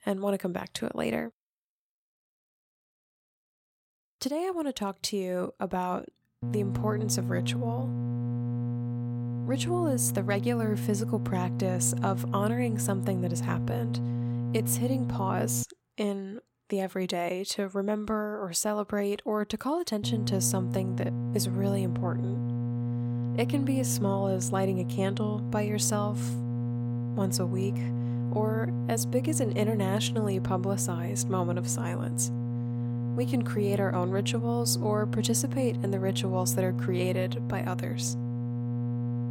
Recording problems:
electrical hum; loud; from 6.5 to 16 s and from 20 s on; 60 Hz, 8 dB below the speech

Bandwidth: 16.5 kHz